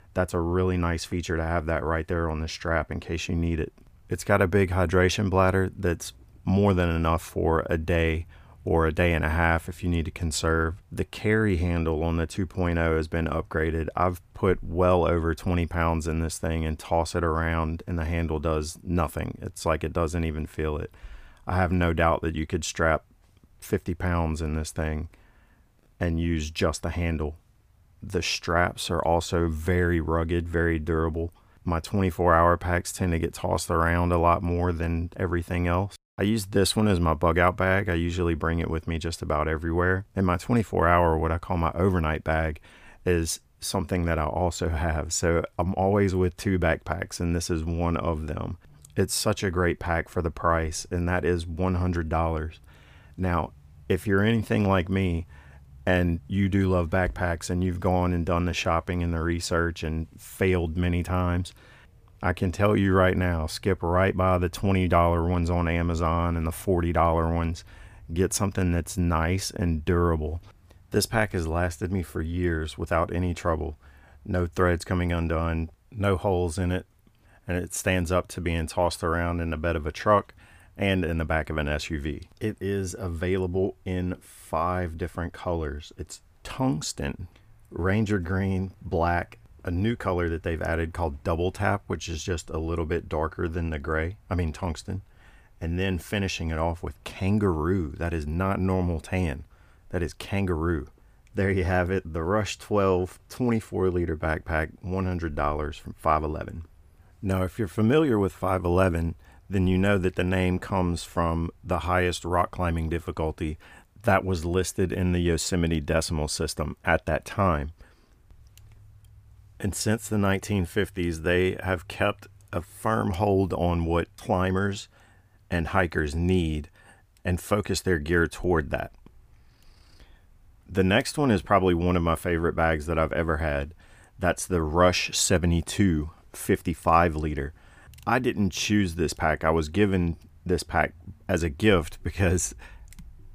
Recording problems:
none

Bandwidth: 15 kHz